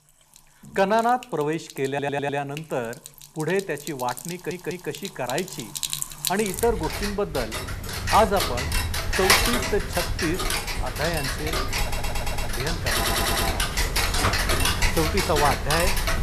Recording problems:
household noises; very loud; throughout; 2 dB above the speech
audio stuttering; 4 times, first at 2 s

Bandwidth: 14 kHz